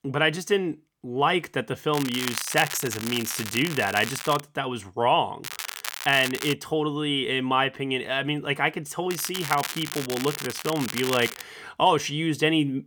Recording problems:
crackling; loud; from 2 to 4.5 s, from 5.5 to 6.5 s and from 9 to 11 s; 8 dB below the speech

